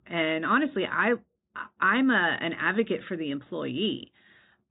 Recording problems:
high frequencies cut off; severe; nothing above 4 kHz

